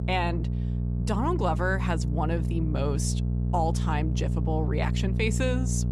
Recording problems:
electrical hum; loud; throughout; 60 Hz, 9 dB below the speech

